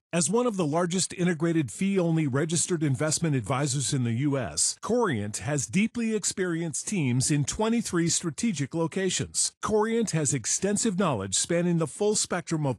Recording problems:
garbled, watery; slightly

